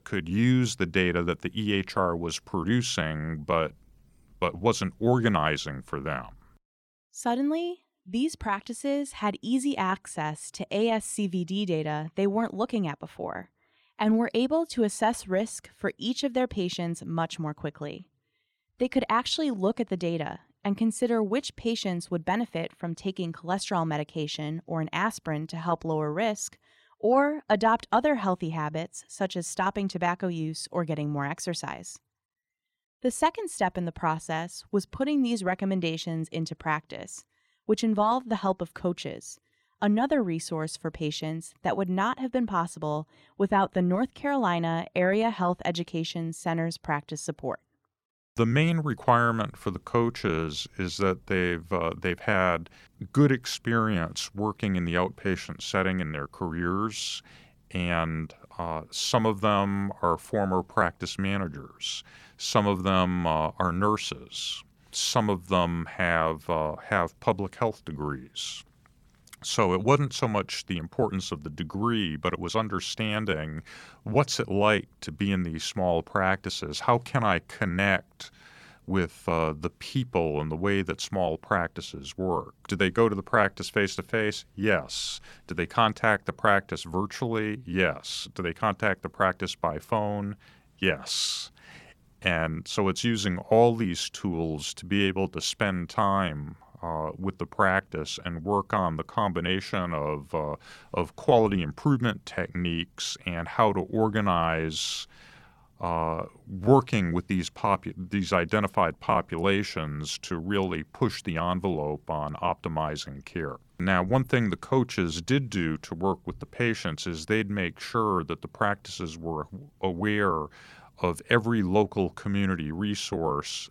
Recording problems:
none

